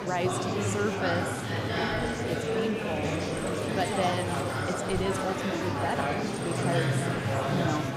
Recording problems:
murmuring crowd; very loud; throughout; 4 dB above the speech

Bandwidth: 15.5 kHz